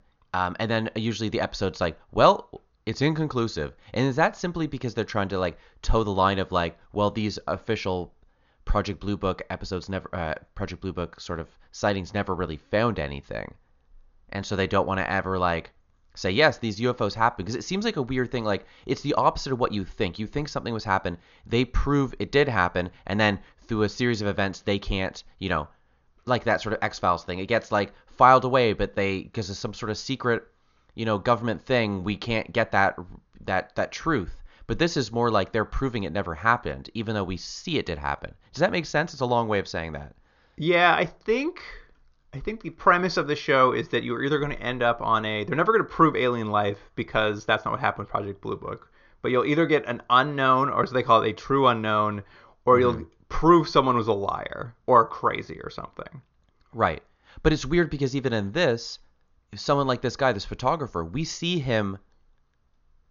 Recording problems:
high frequencies cut off; noticeable; nothing above 6.5 kHz

